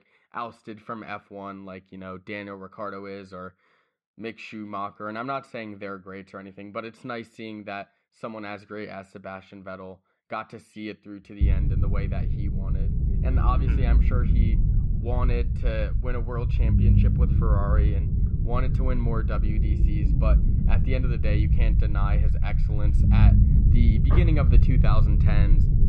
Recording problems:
muffled; slightly; fading above 2.5 kHz
low rumble; loud; from 11 s on; 3 dB below the speech

